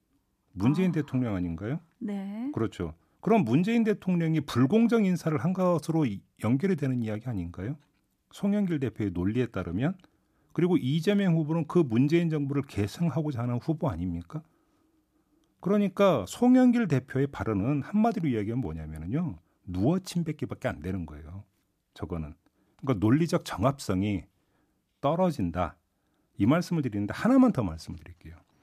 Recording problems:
none

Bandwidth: 14.5 kHz